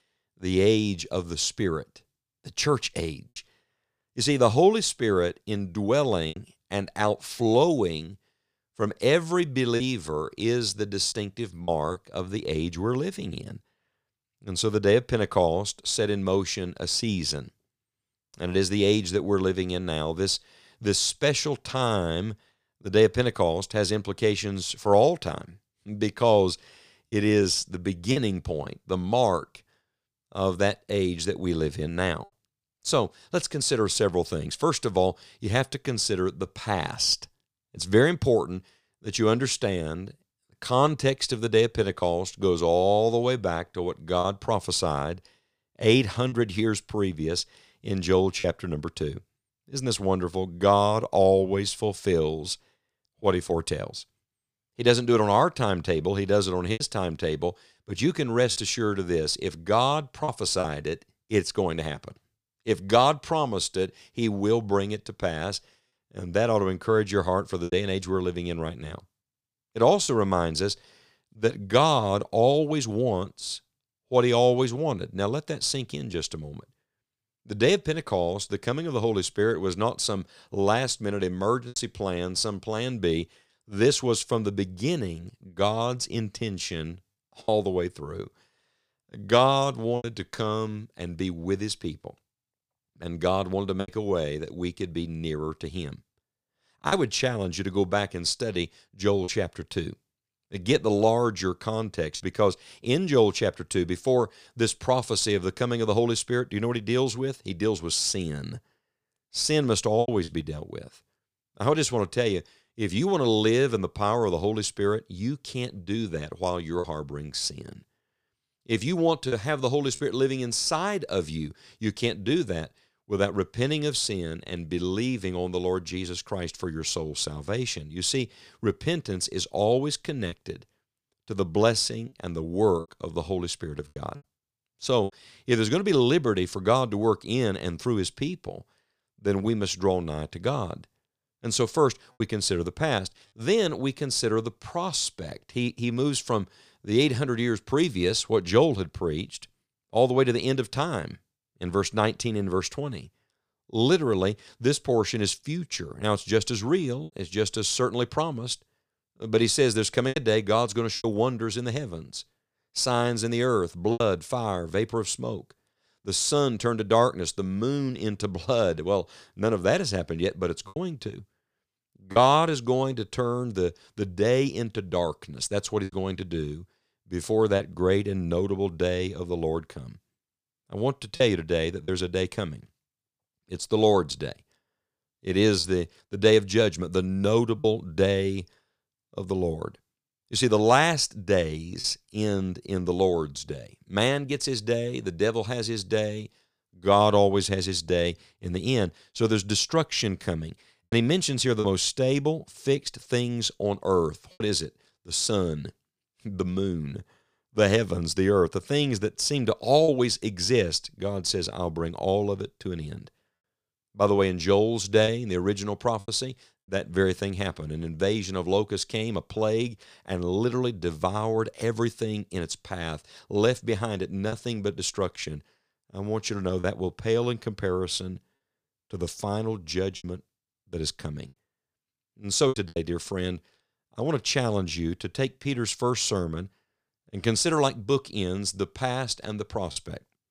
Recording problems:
choppy; occasionally; 2% of the speech affected

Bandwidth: 15 kHz